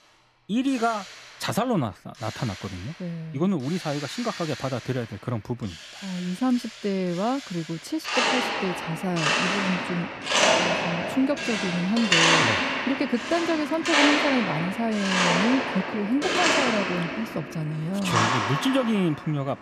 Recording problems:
machinery noise; very loud; throughout; 3 dB above the speech

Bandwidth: 14.5 kHz